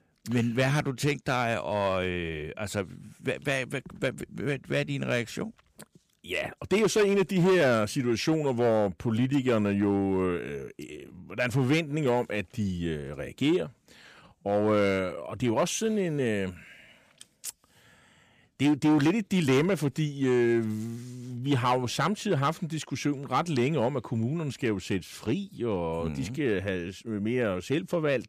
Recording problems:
distortion; slight; 4% of the sound clipped

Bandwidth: 15 kHz